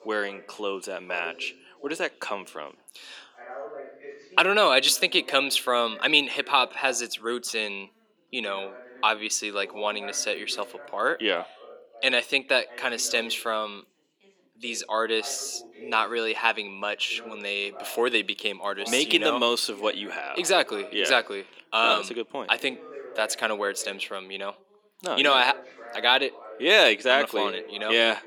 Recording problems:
thin; somewhat; fading below 300 Hz
background chatter; noticeable; throughout; 2 voices, 20 dB below the speech

